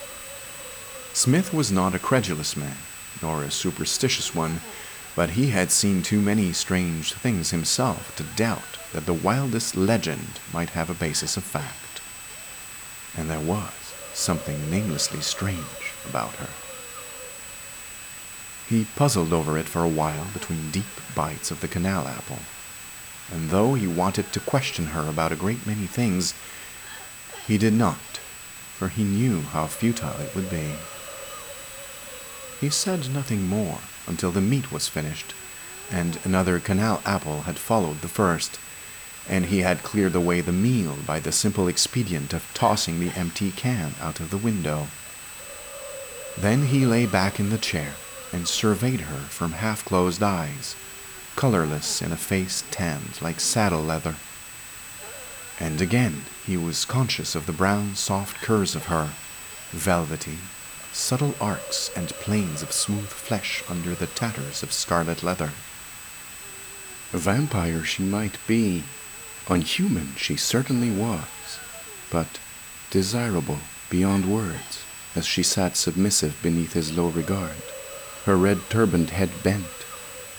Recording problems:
high-pitched whine; noticeable; throughout; 8 kHz, 15 dB below the speech
hiss; noticeable; throughout; 15 dB below the speech

